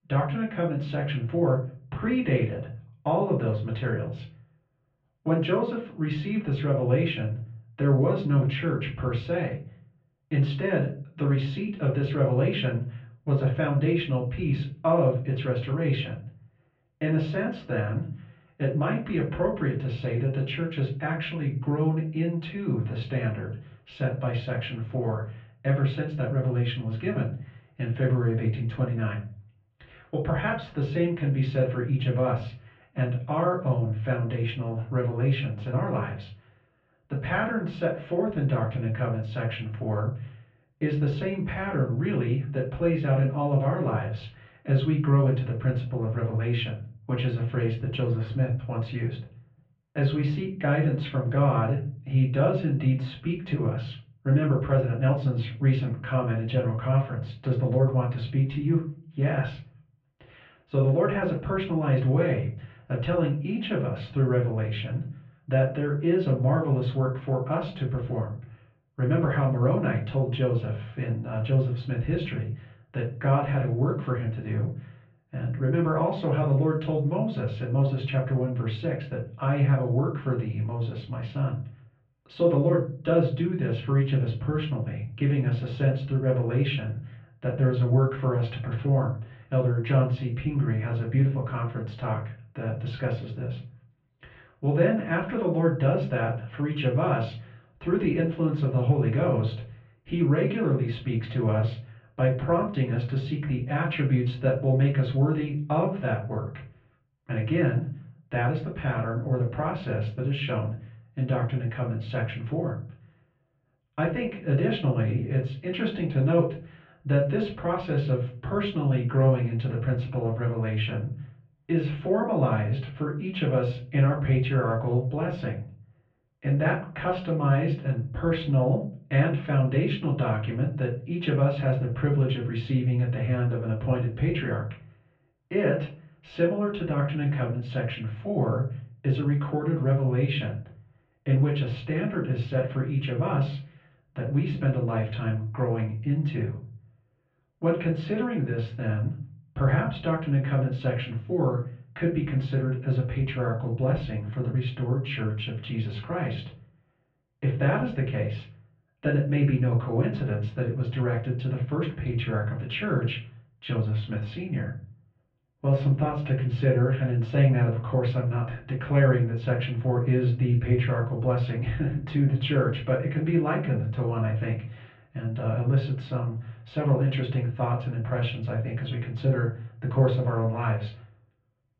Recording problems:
off-mic speech; far
muffled; very; fading above 3 kHz
room echo; slight; dies away in 0.4 s

